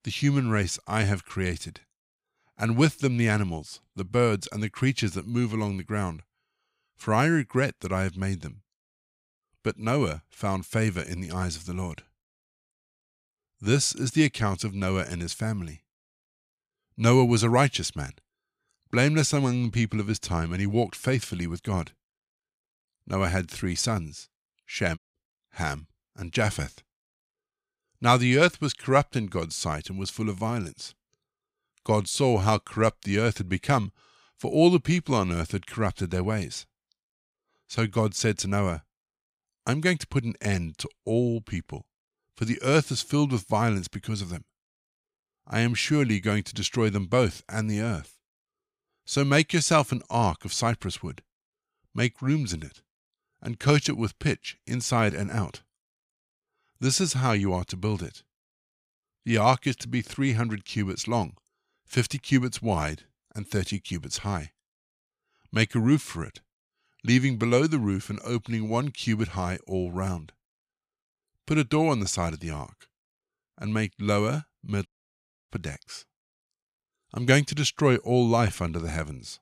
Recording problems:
audio cutting out; at 25 s and at 1:15 for 0.5 s

